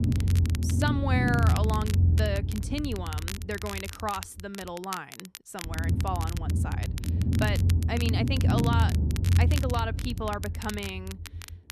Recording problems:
low rumble; loud; throughout; 6 dB below the speech
crackle, like an old record; loud; 8 dB below the speech

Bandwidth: 13.5 kHz